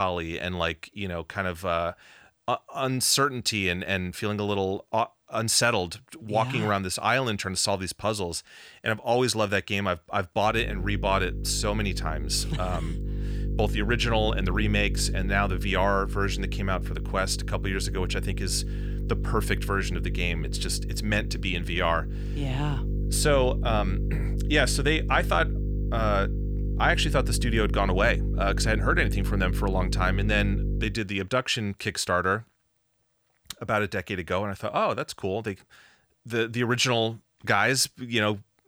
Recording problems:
electrical hum; noticeable; from 11 to 31 s; 50 Hz, 15 dB below the speech
abrupt cut into speech; at the start

